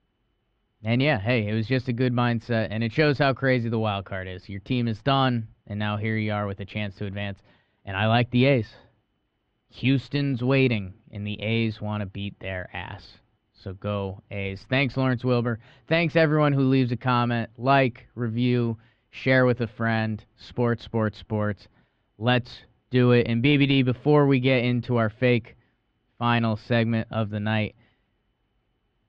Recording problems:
muffled; very; fading above 3 kHz

